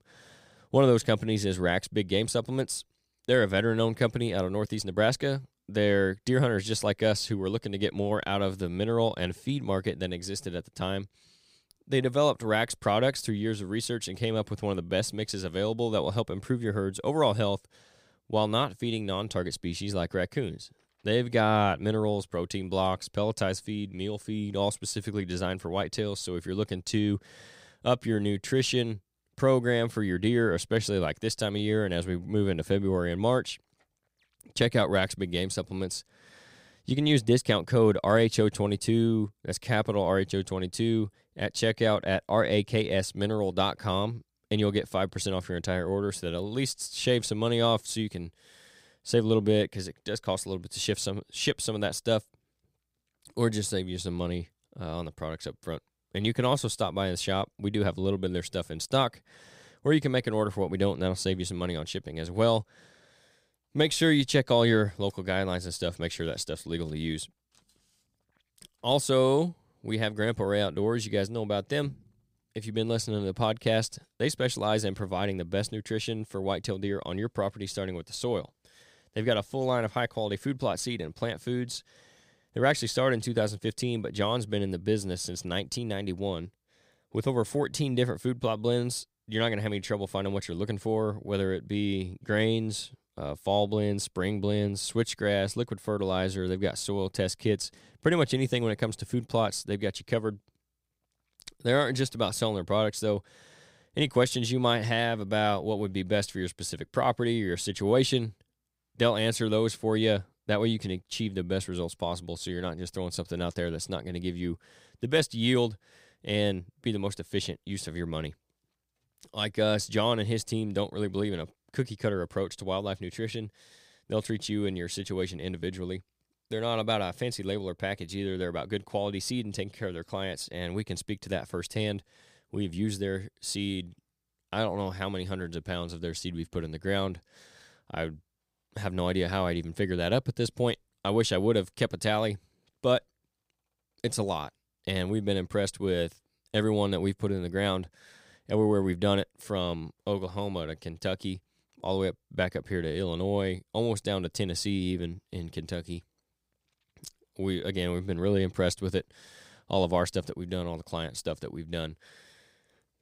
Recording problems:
none

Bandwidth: 15.5 kHz